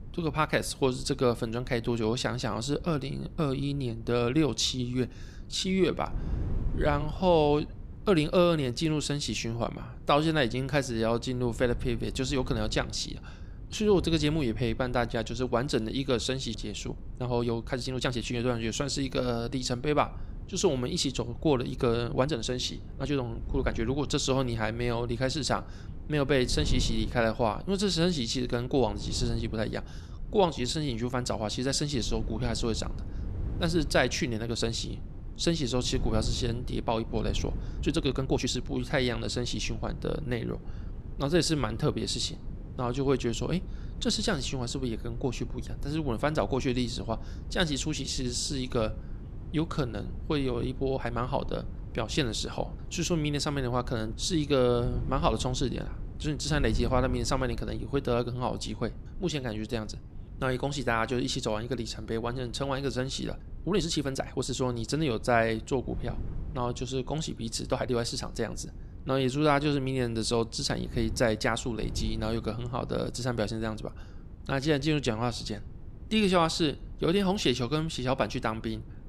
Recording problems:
wind noise on the microphone; occasional gusts; 20 dB below the speech
uneven, jittery; strongly; from 2 s to 1:15

